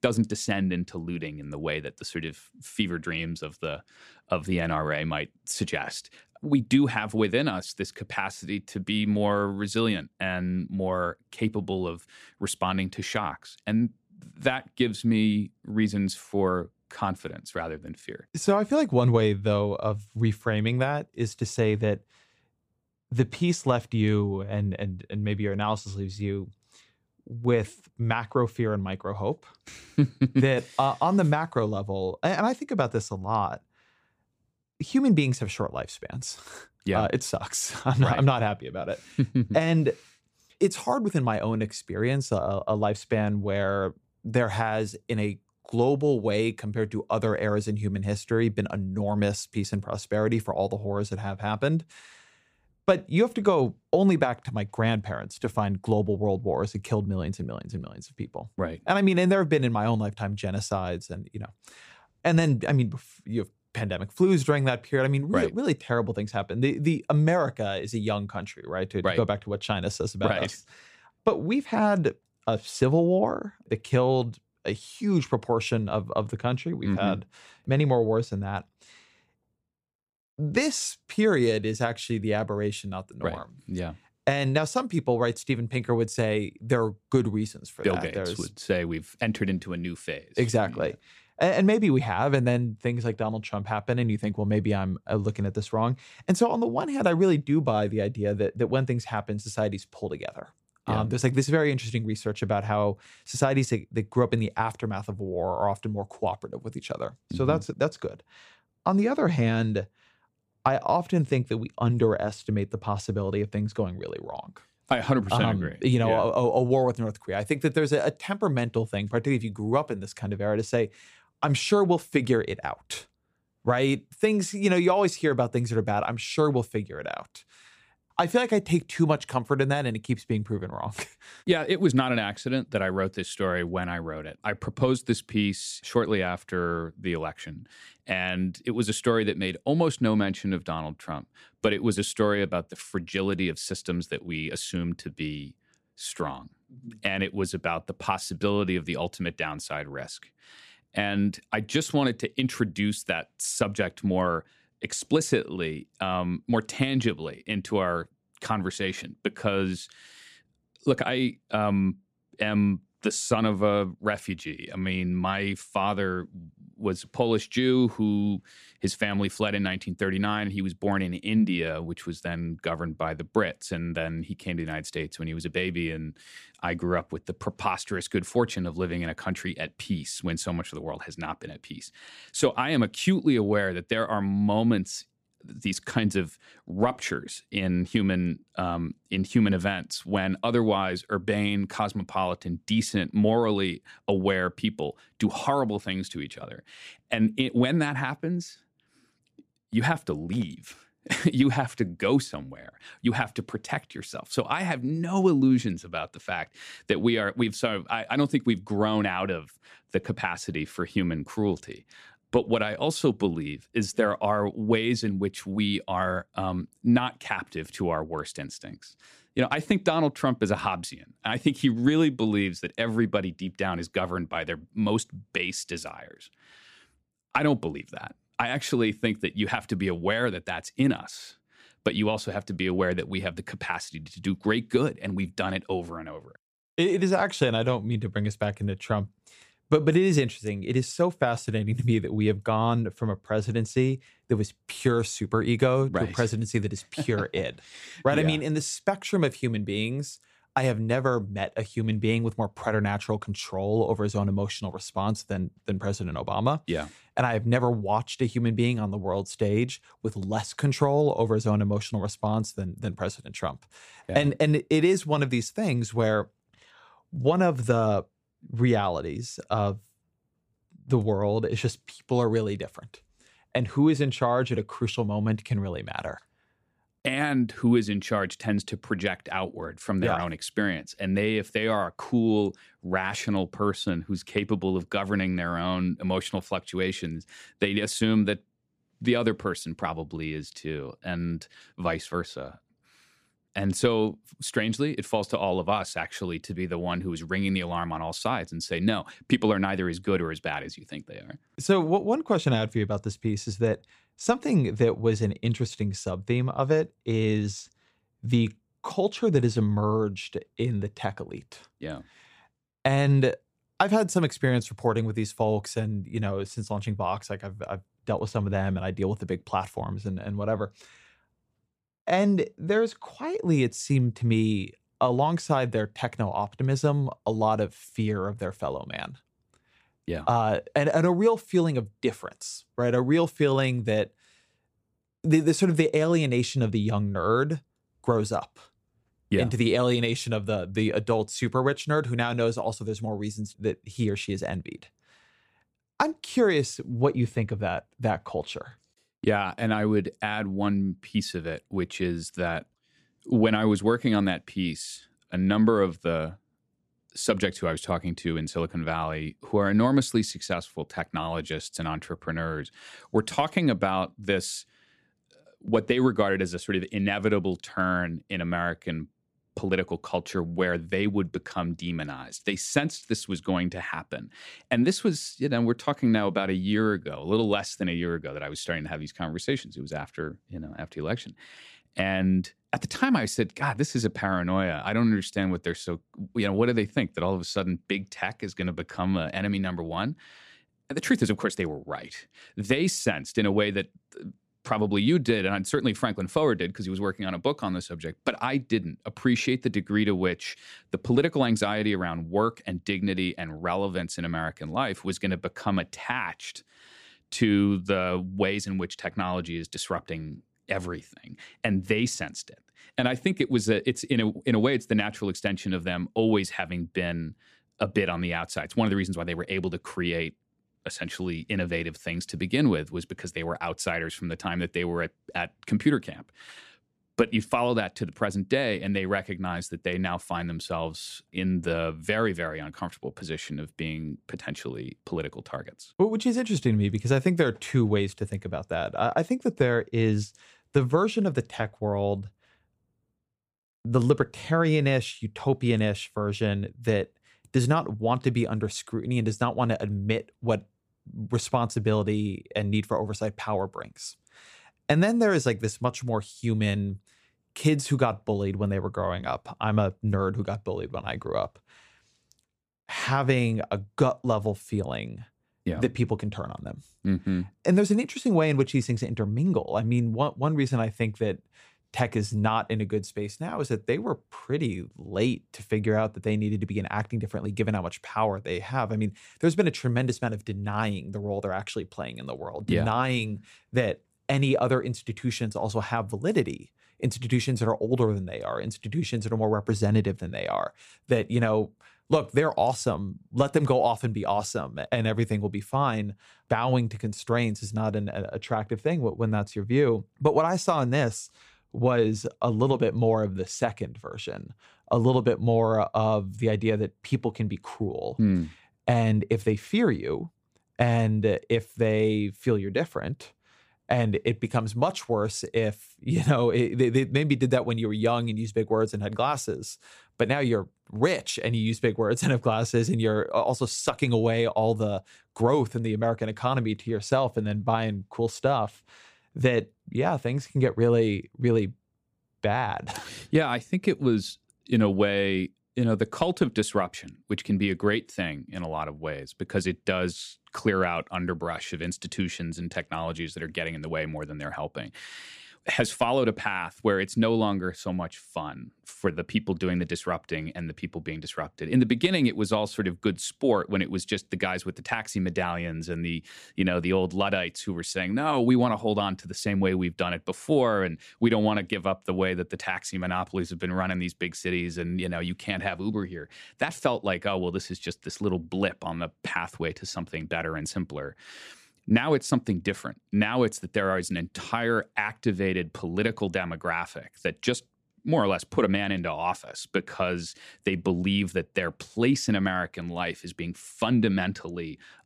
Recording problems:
none

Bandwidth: 15 kHz